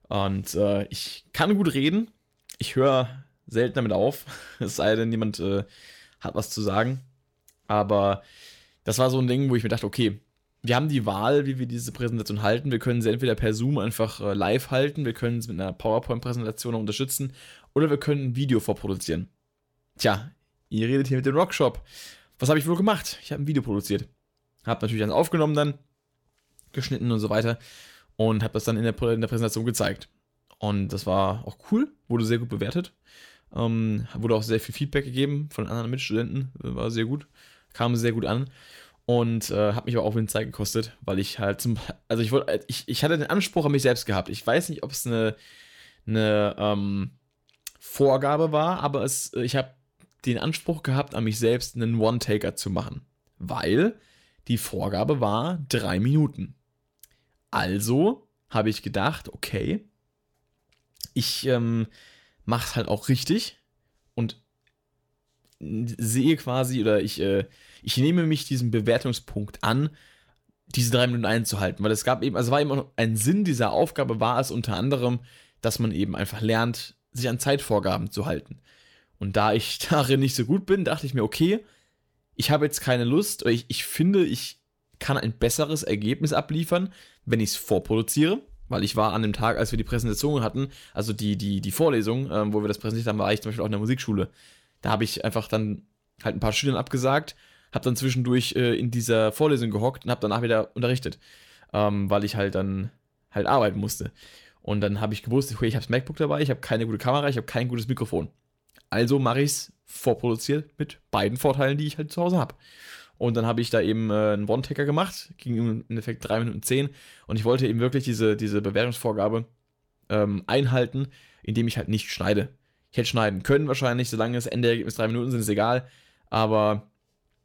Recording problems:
none

